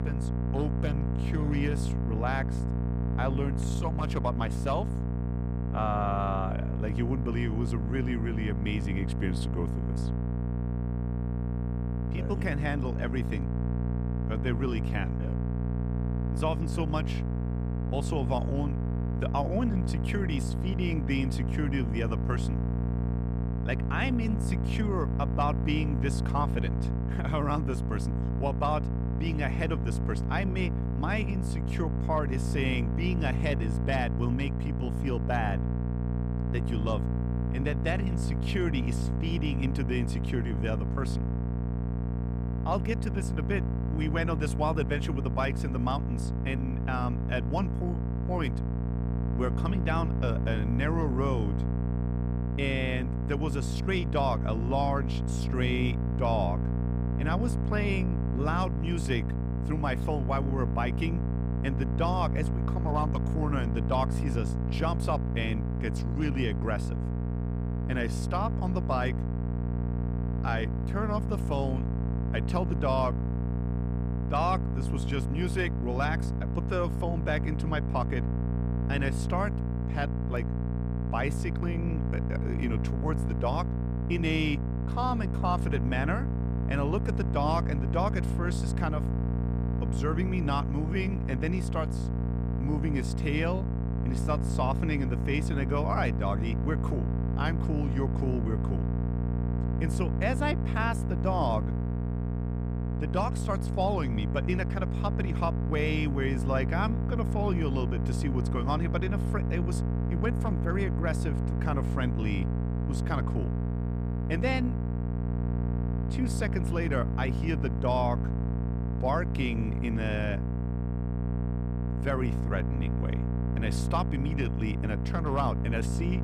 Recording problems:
electrical hum; loud; throughout; 60 Hz, 6 dB below the speech

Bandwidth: 15.5 kHz